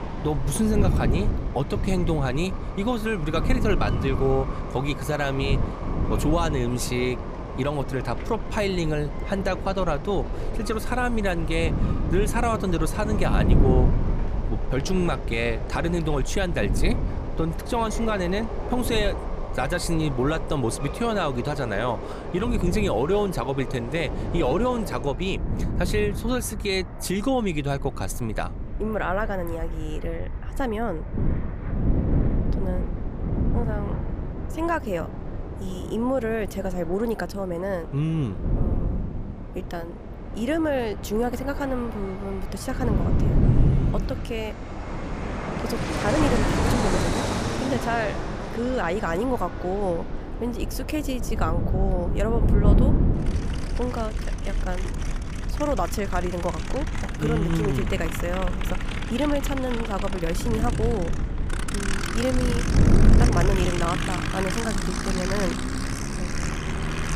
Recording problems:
wind noise on the microphone; heavy; 9 dB below the speech
train or aircraft noise; loud; throughout; 7 dB below the speech
low rumble; faint; throughout; 25 dB below the speech

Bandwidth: 15 kHz